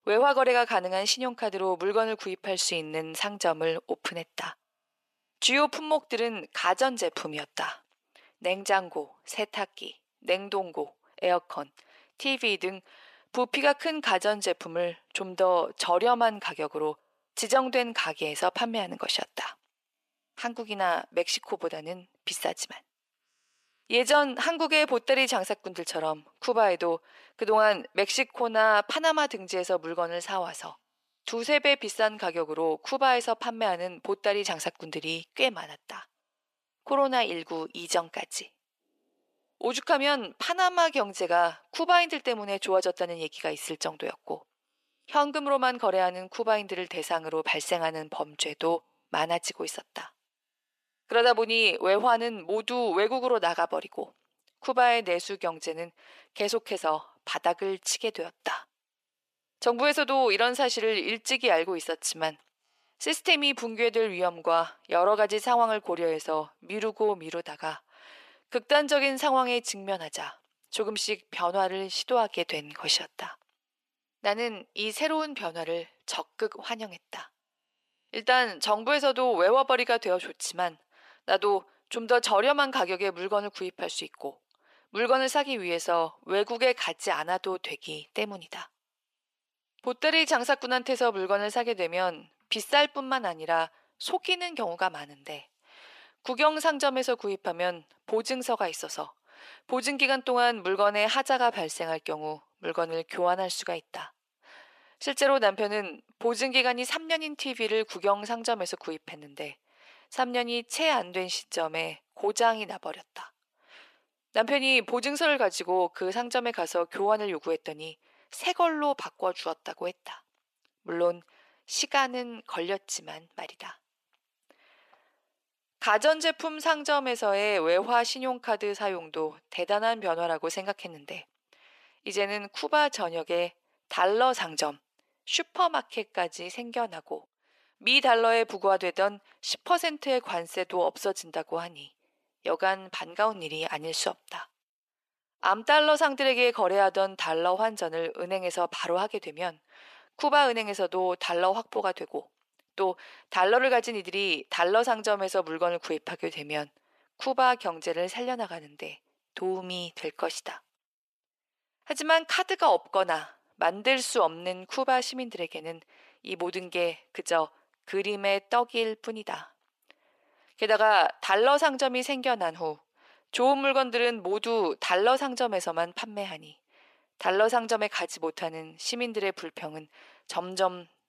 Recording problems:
thin; very; fading below 600 Hz

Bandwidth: 14.5 kHz